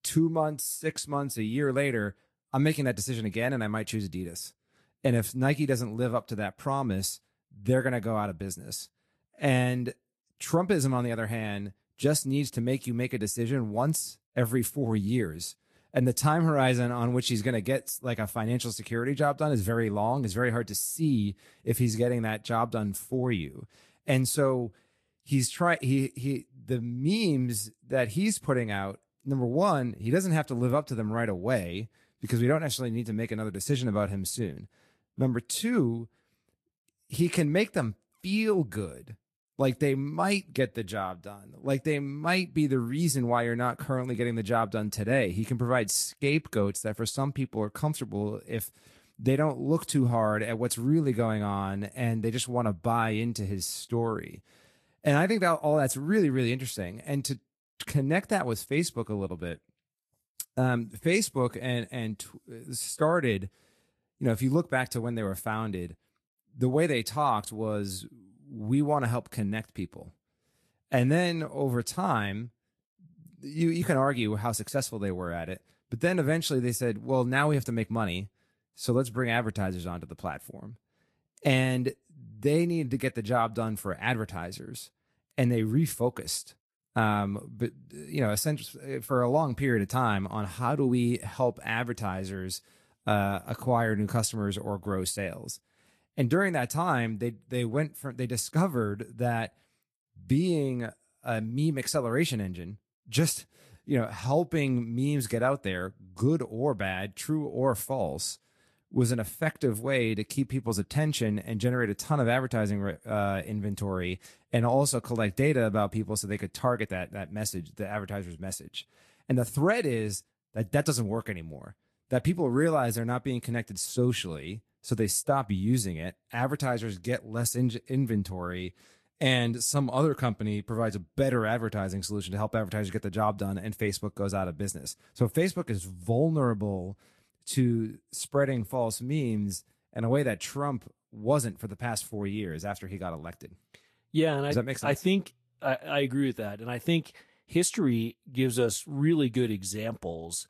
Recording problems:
garbled, watery; slightly; nothing above 12.5 kHz

